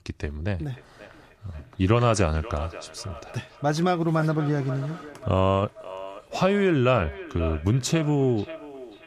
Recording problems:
echo of what is said; noticeable; throughout; 540 ms later, 15 dB below the speech

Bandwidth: 14.5 kHz